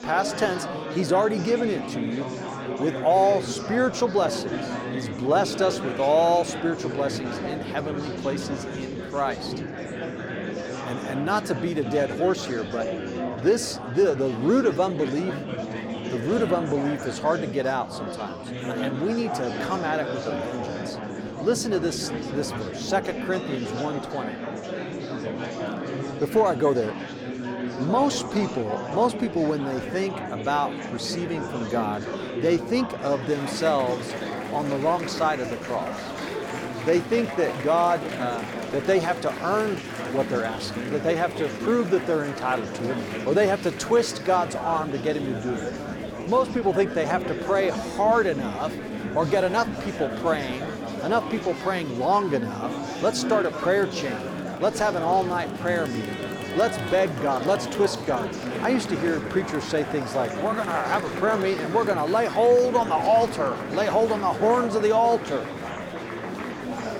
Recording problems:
murmuring crowd; loud; throughout; 6 dB below the speech

